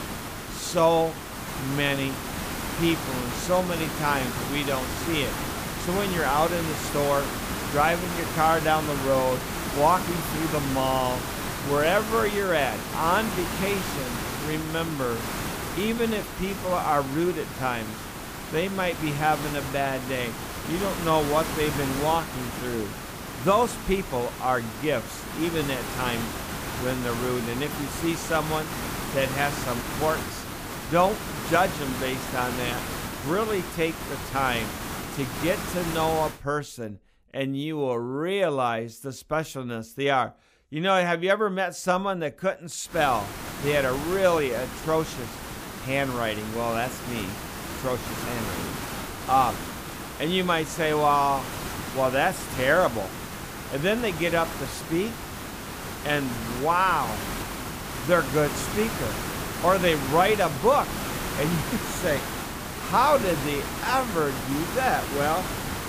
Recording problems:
hiss; loud; until 36 s and from 43 s on; 6 dB below the speech

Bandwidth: 15 kHz